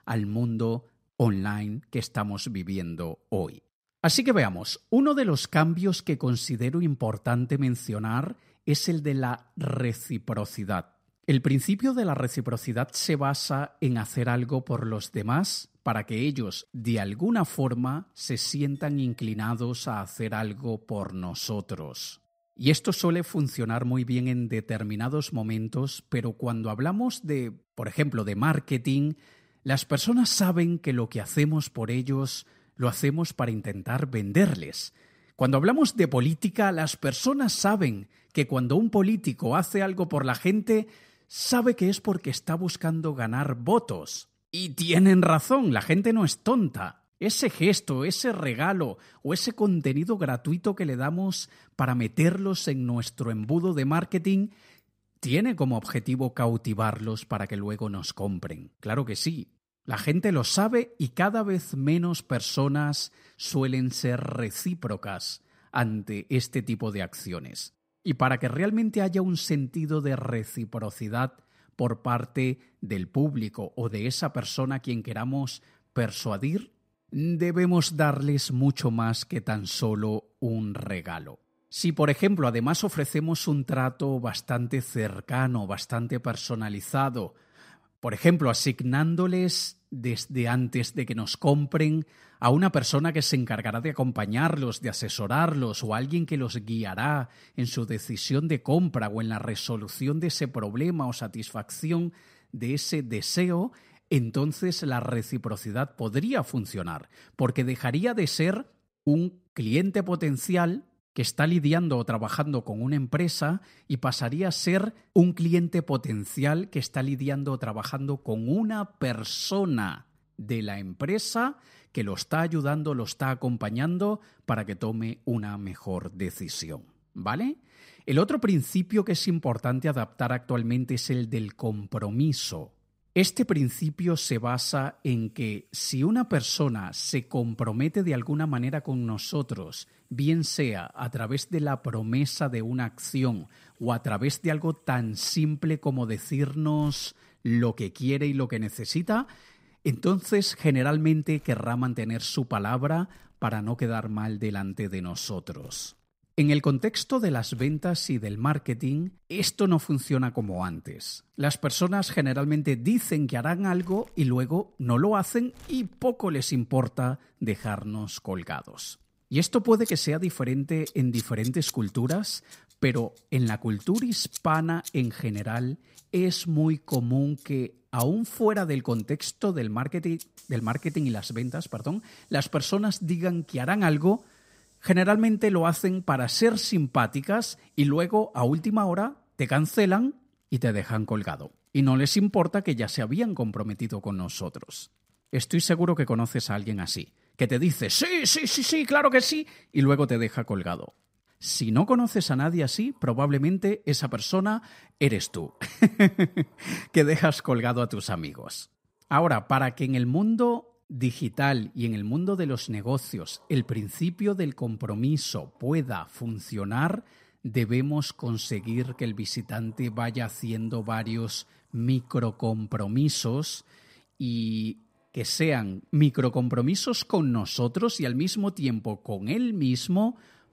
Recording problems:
household noises; faint; throughout; 20 dB below the speech

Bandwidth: 15.5 kHz